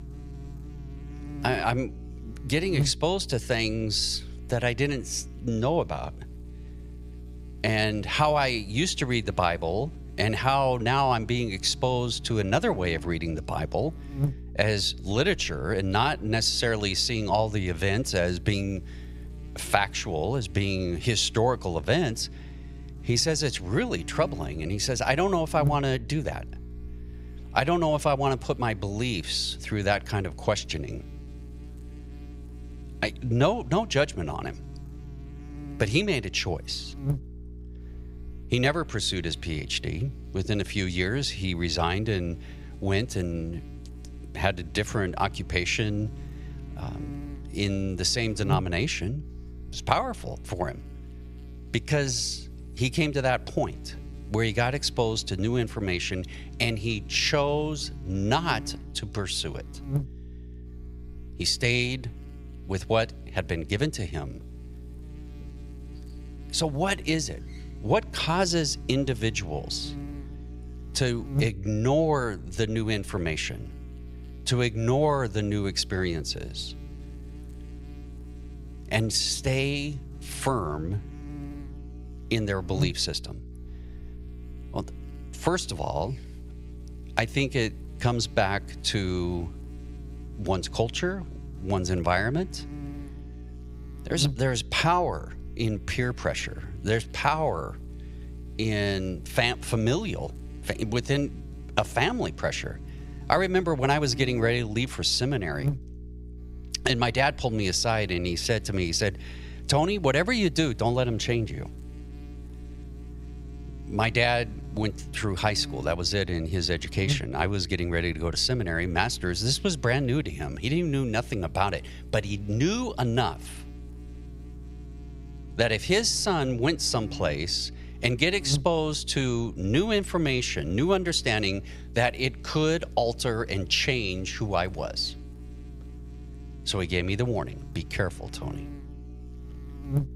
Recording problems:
electrical hum; faint; throughout; 60 Hz, 20 dB below the speech

